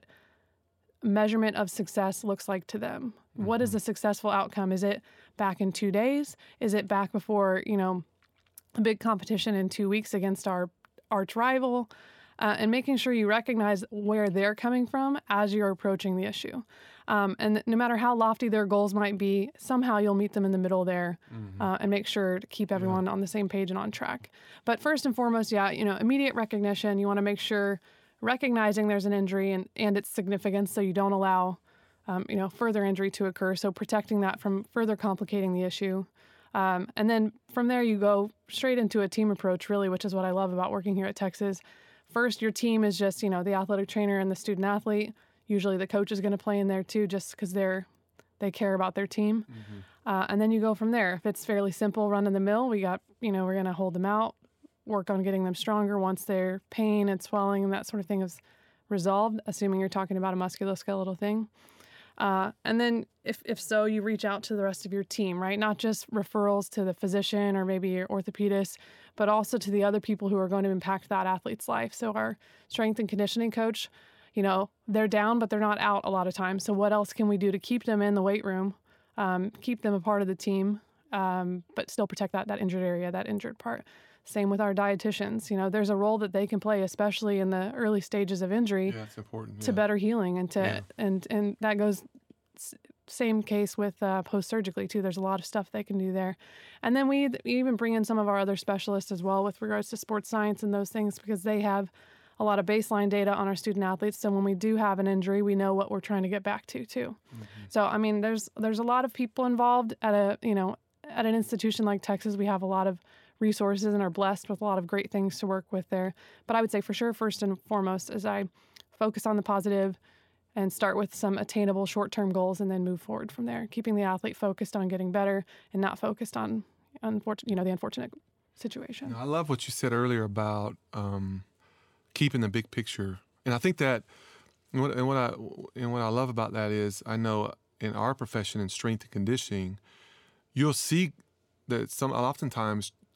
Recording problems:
uneven, jittery; strongly; from 14 s to 2:14

